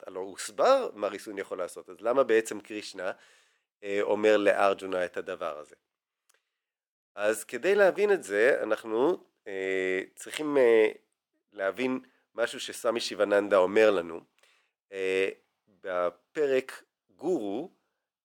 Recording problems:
thin; somewhat; fading below 550 Hz

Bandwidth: 18.5 kHz